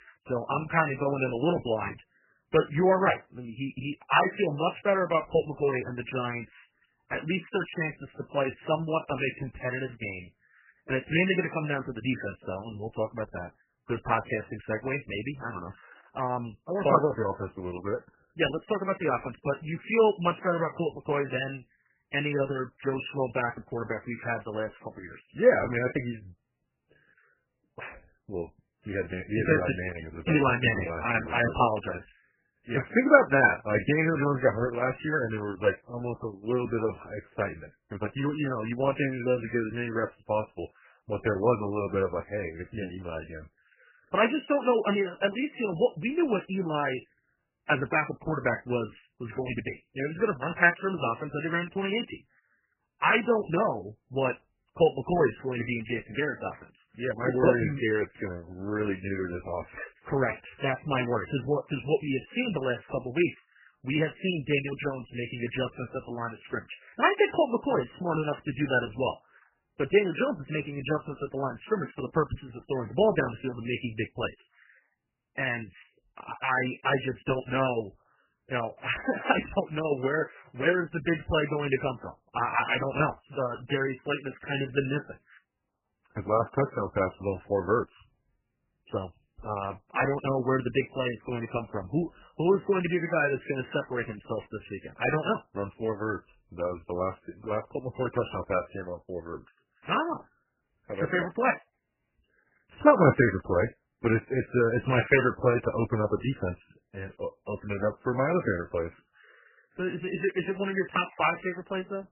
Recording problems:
garbled, watery; badly; nothing above 3 kHz

